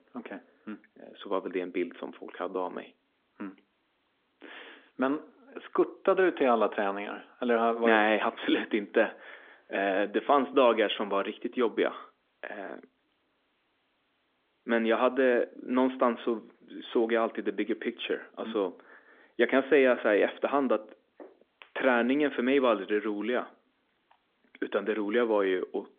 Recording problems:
phone-call audio; nothing above 3.5 kHz

